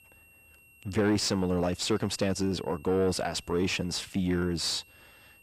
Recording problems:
distortion; slight; 10 dB below the speech
high-pitched whine; faint; throughout; 2.5 kHz, 25 dB below the speech

